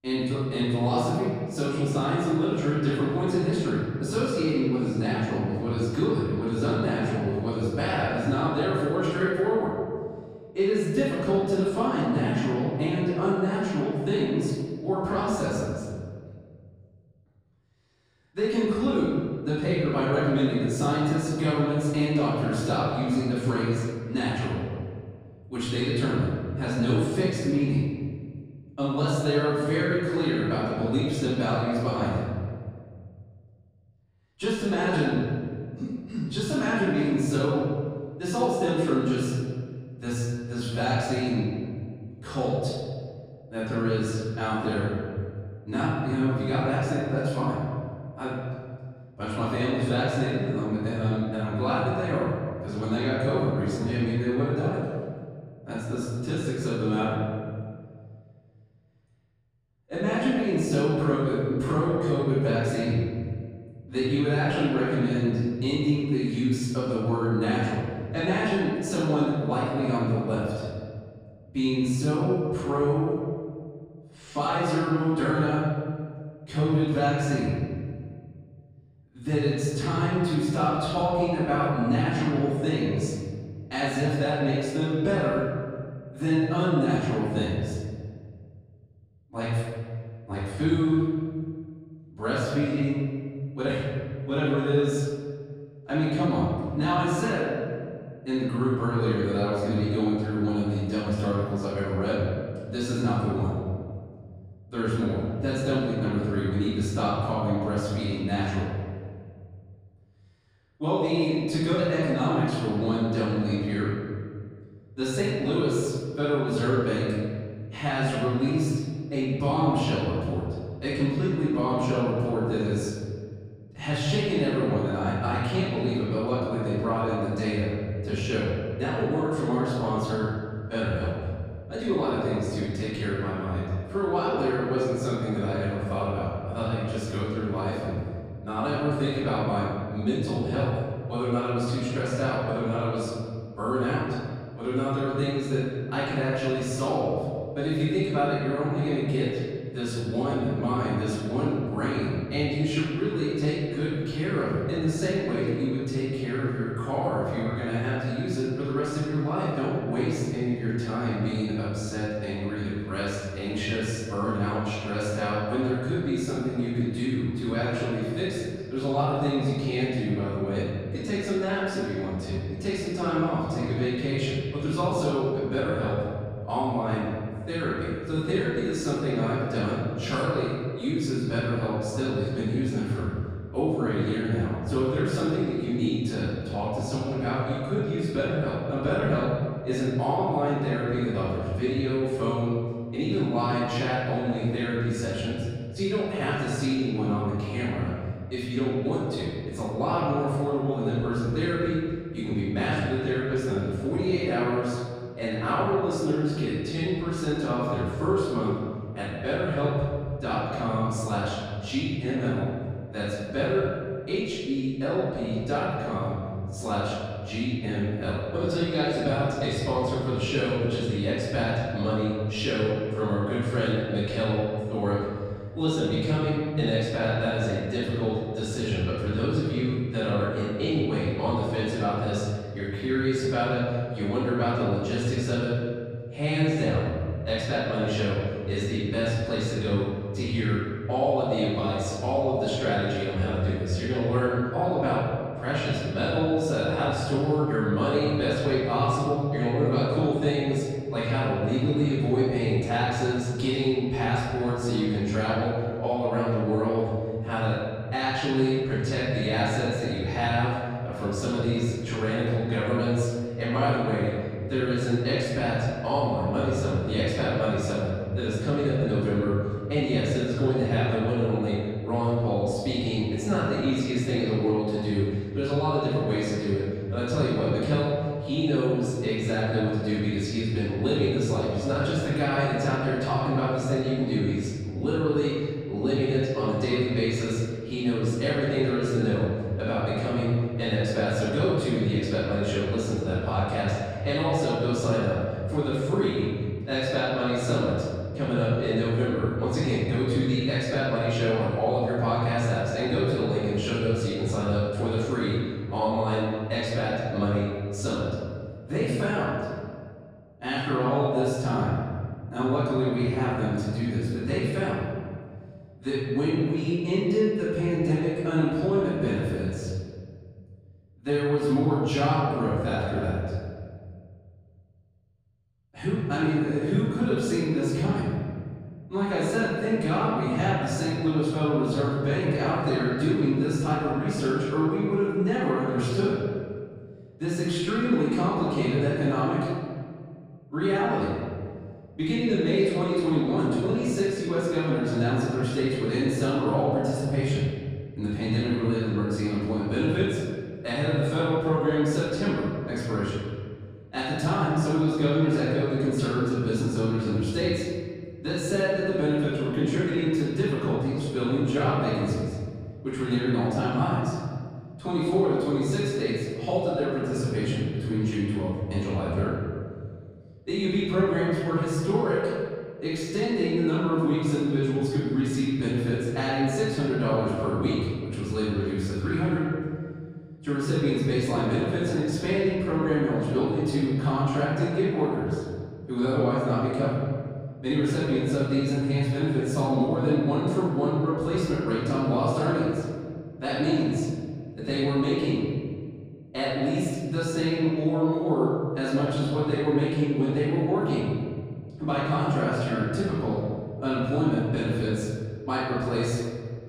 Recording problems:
room echo; strong; dies away in 1.9 s
off-mic speech; far

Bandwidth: 15 kHz